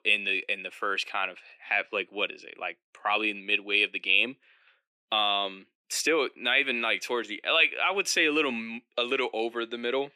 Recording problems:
thin; very slightly; fading below 250 Hz

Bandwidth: 14.5 kHz